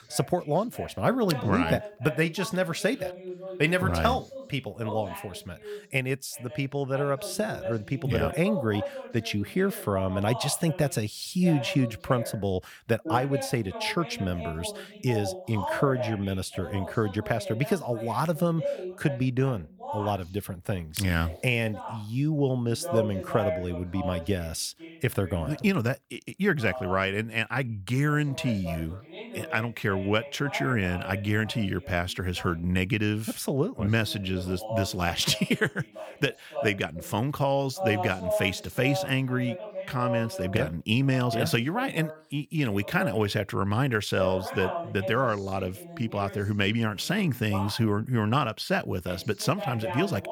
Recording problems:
voice in the background; loud; throughout; 10 dB below the speech

